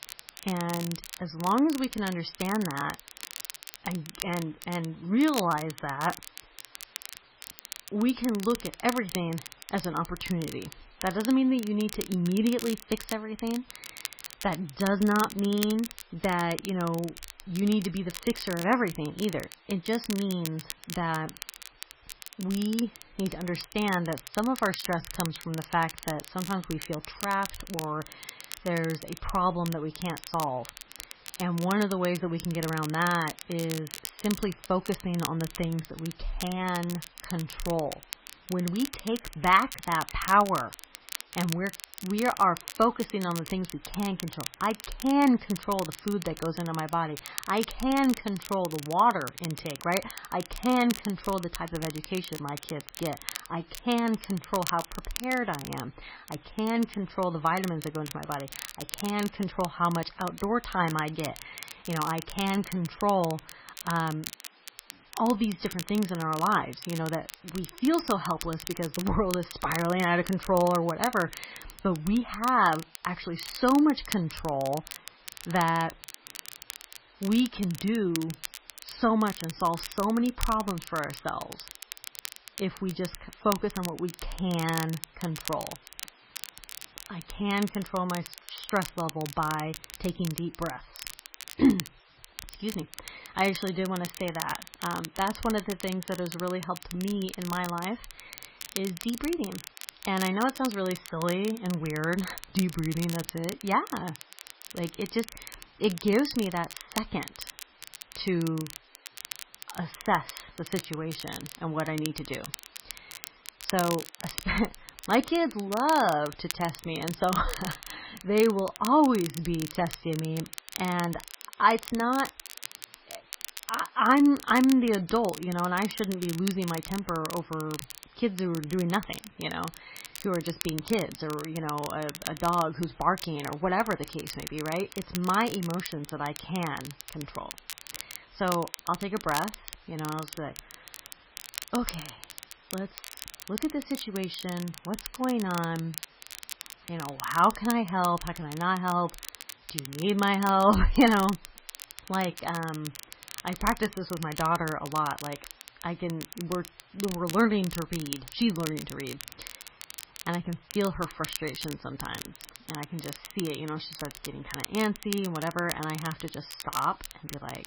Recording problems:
garbled, watery; badly; nothing above 5.5 kHz
crackle, like an old record; noticeable; 10 dB below the speech
hiss; faint; throughout; 30 dB below the speech

